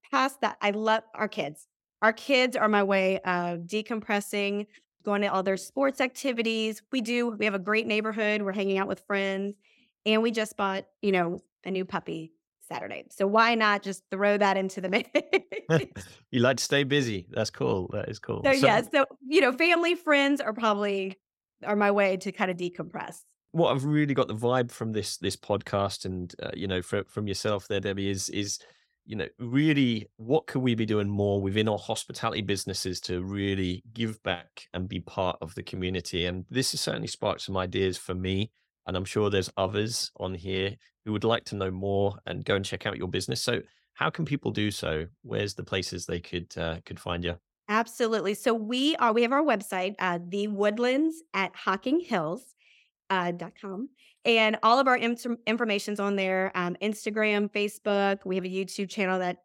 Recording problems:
none

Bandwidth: 16.5 kHz